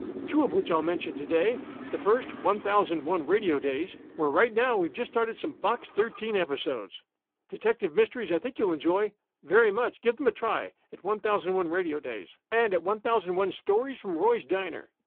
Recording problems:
phone-call audio; poor line
traffic noise; noticeable; until 6 s; 15 dB below the speech

